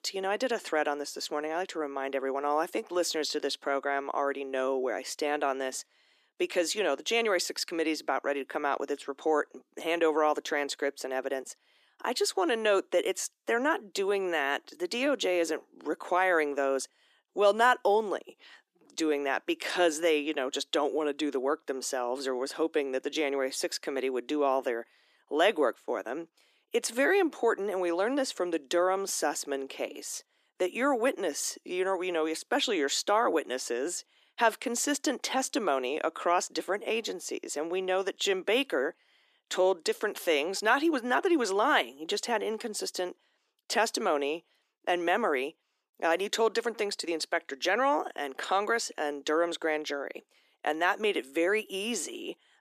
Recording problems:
thin; somewhat; fading below 300 Hz

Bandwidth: 14.5 kHz